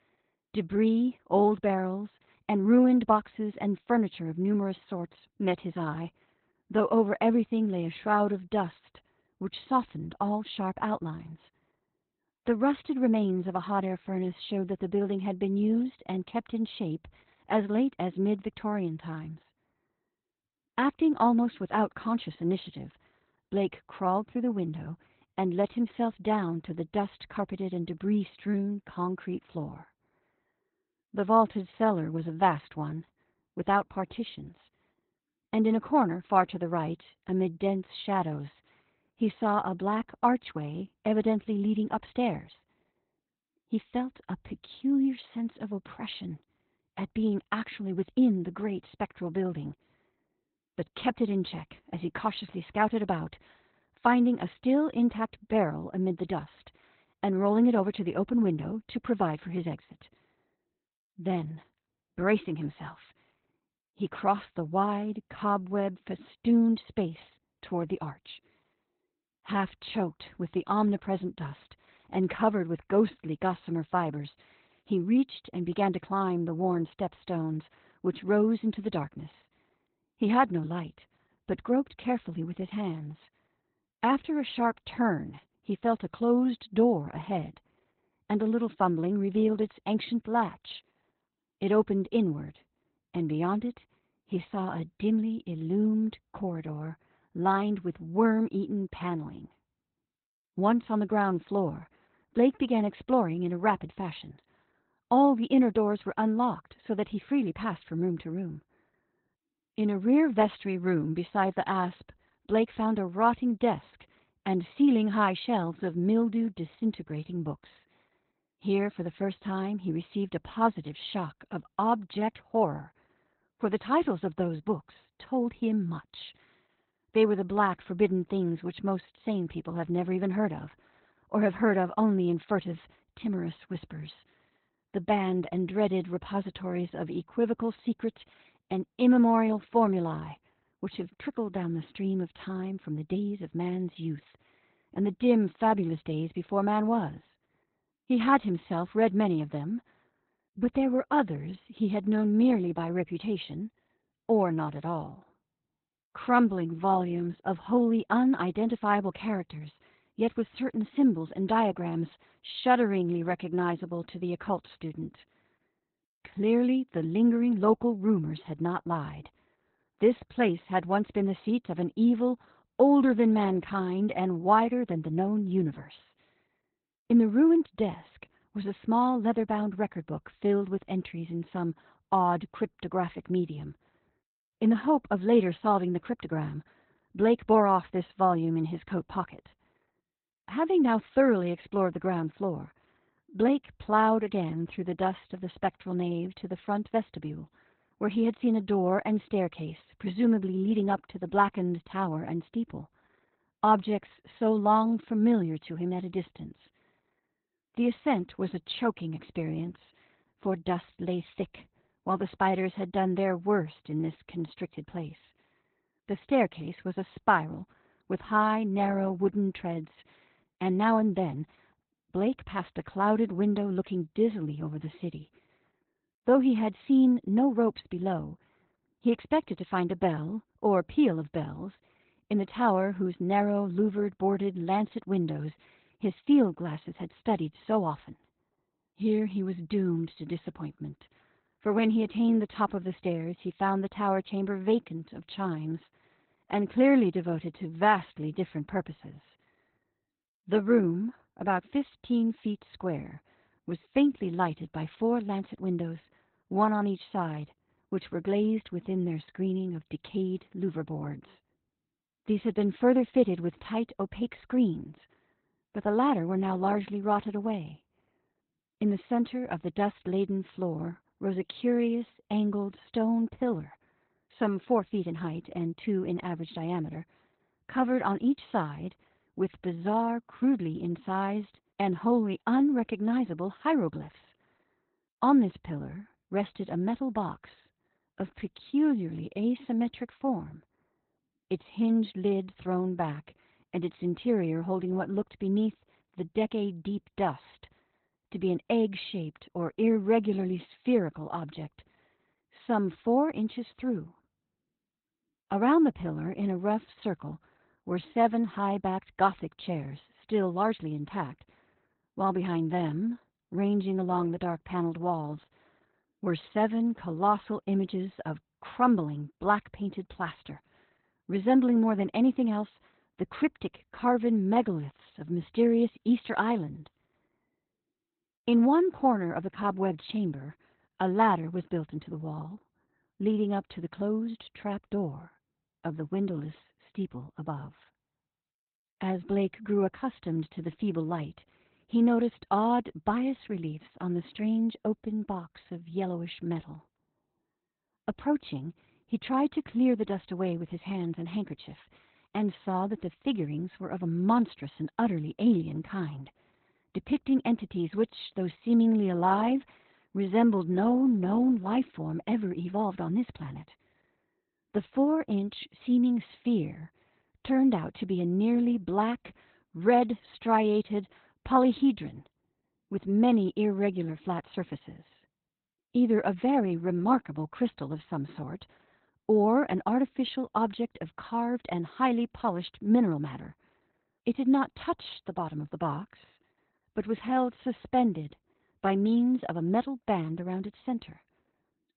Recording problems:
garbled, watery; badly; nothing above 4 kHz

